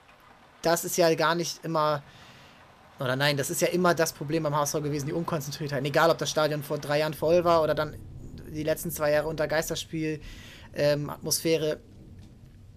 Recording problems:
rain or running water; faint; throughout; 25 dB below the speech

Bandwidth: 14.5 kHz